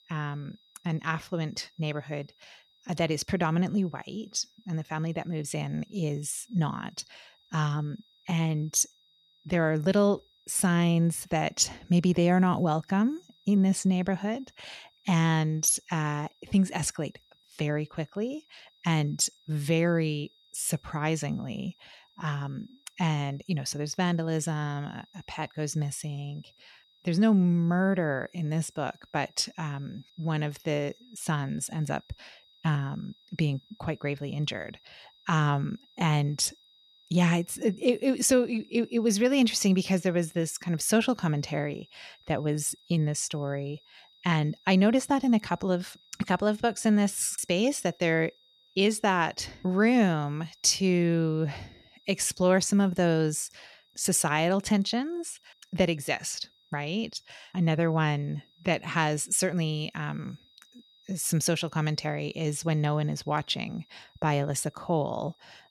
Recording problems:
high-pitched whine; faint; throughout; 4 kHz, 30 dB below the speech

